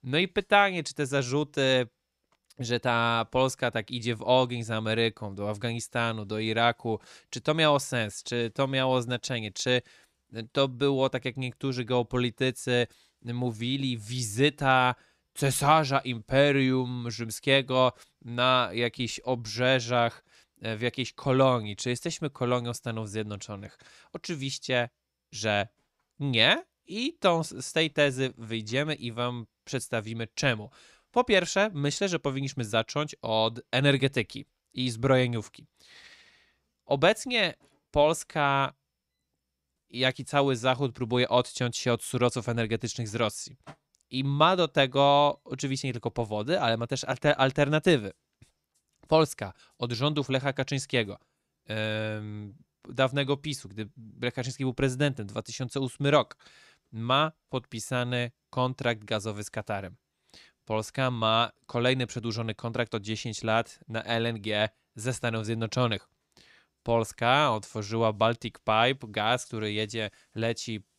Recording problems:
none

